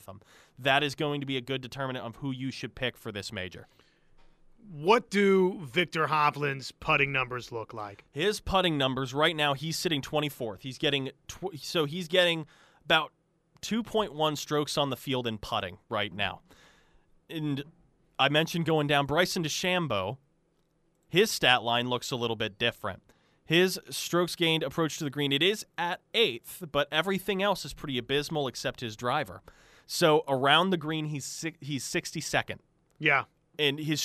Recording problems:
abrupt cut into speech; at the end

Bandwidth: 14.5 kHz